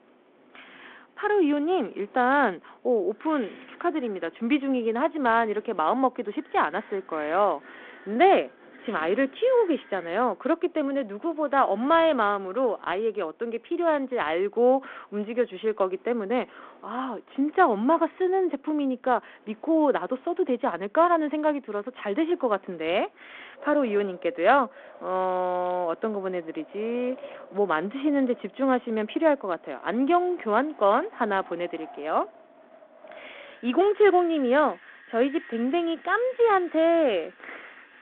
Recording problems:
phone-call audio
wind in the background; faint; throughout; 25 dB below the speech

